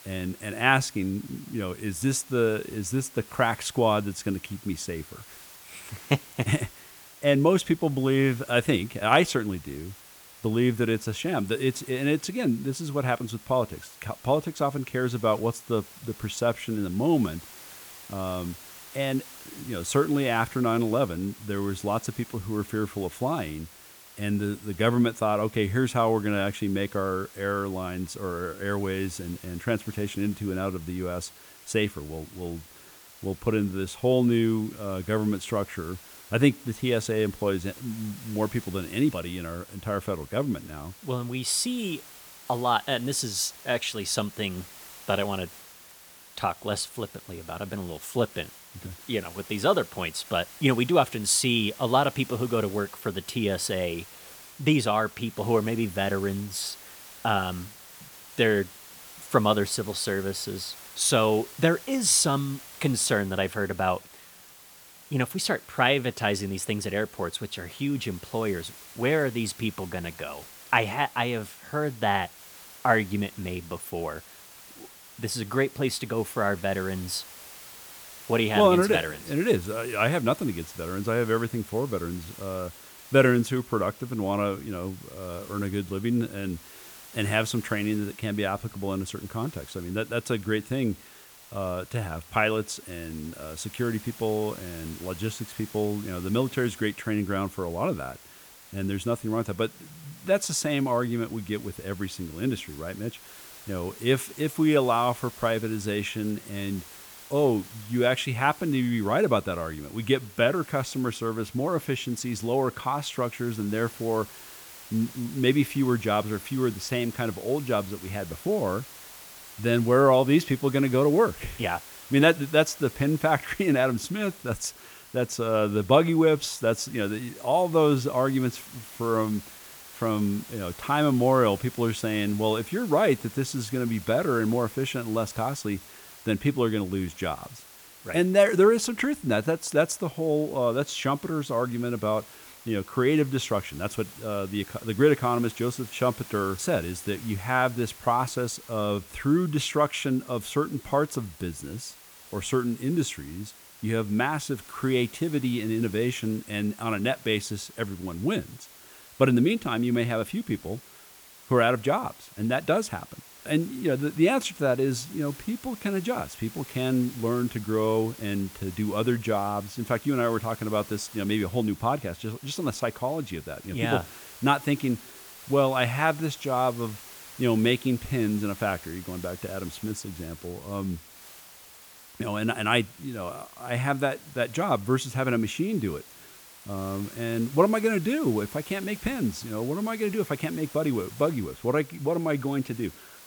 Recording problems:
hiss; noticeable; throughout; 20 dB below the speech

